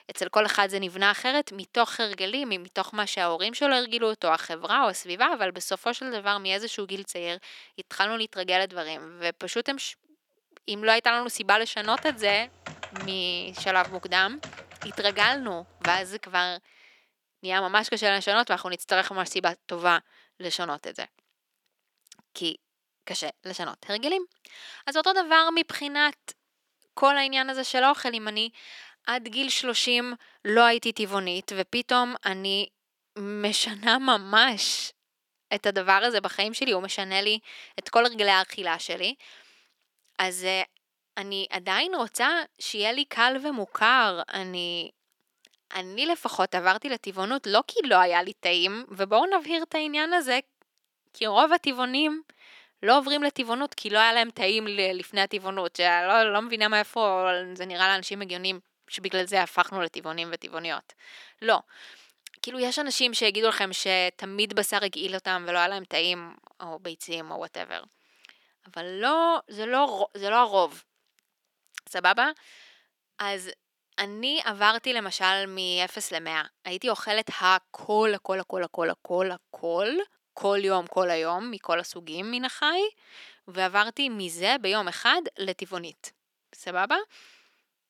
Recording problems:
thin; very slightly; fading below 350 Hz
keyboard typing; noticeable; from 12 to 16 s; peak 8 dB below the speech

